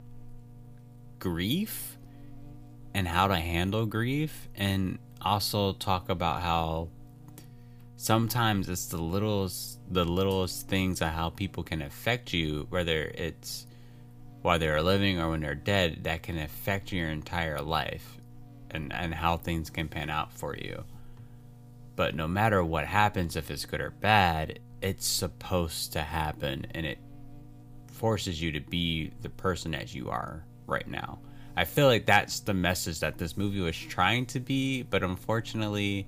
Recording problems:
electrical hum; faint; throughout; 60 Hz, 30 dB below the speech

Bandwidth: 15 kHz